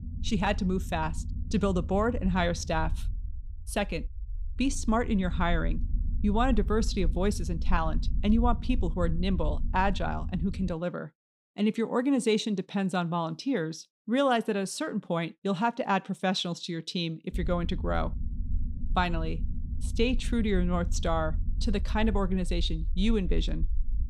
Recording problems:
low rumble; faint; until 11 s and from 17 s on; 20 dB below the speech

